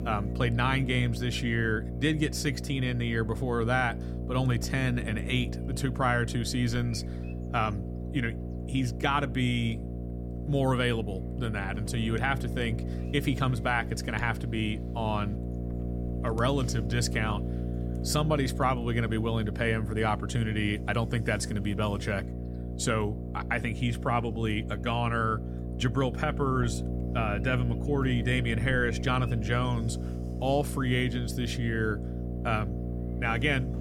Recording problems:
electrical hum; noticeable; throughout; 60 Hz, 10 dB below the speech

